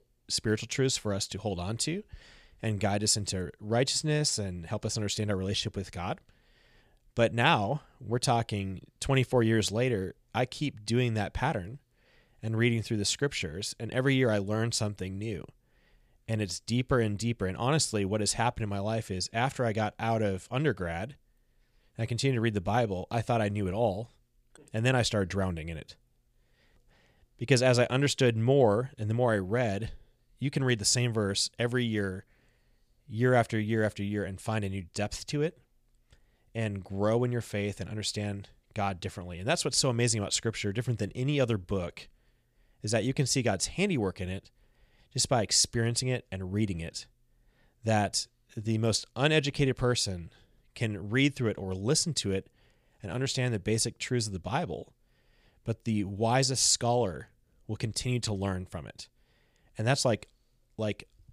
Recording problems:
none

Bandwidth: 15 kHz